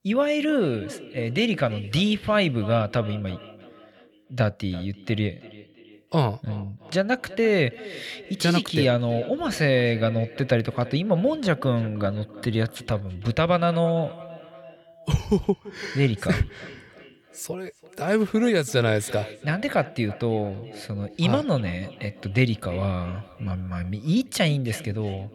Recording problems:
echo of what is said; noticeable; throughout; 340 ms later, 20 dB below the speech

